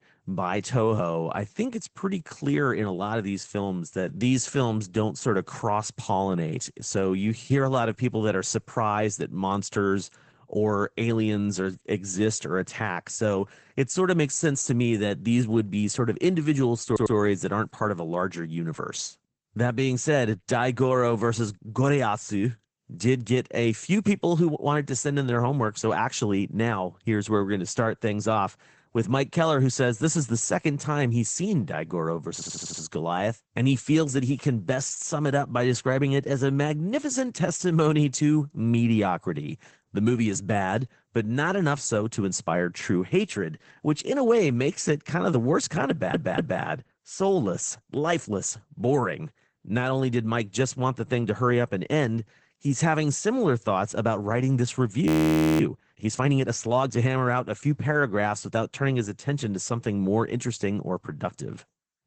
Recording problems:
garbled, watery; badly; nothing above 7.5 kHz
audio stuttering; at 17 s, at 32 s and at 46 s
audio freezing; at 55 s for 0.5 s

